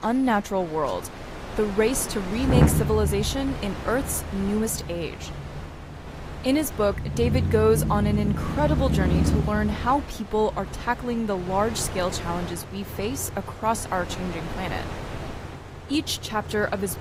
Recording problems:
garbled, watery; slightly; nothing above 15.5 kHz
traffic noise; loud; throughout; 3 dB below the speech
wind noise on the microphone; occasional gusts; 10 dB below the speech

